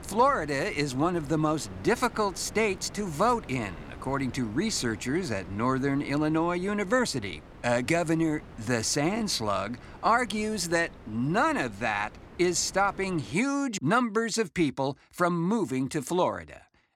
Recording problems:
wind noise on the microphone; occasional gusts; until 13 s; 20 dB below the speech

